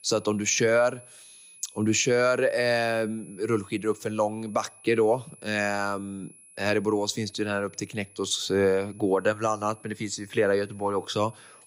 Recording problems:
high-pitched whine; faint; throughout; 10.5 kHz, 25 dB below the speech

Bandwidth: 15.5 kHz